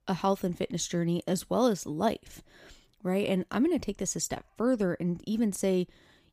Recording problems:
none

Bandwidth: 15 kHz